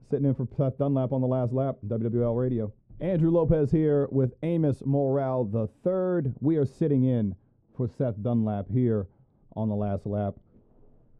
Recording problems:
muffled; very; fading above 1.5 kHz

